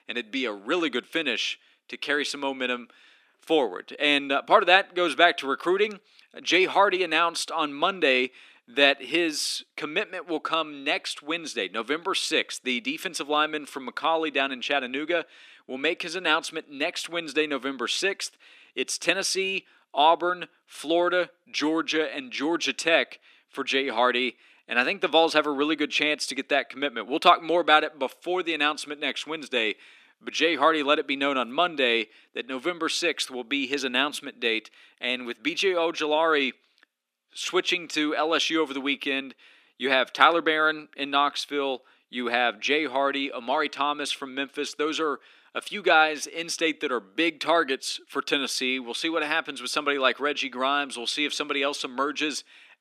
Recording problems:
thin; very slightly; fading below 250 Hz

